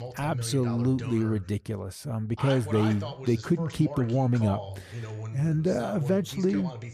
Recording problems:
voice in the background; noticeable; throughout; 10 dB below the speech

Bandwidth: 14.5 kHz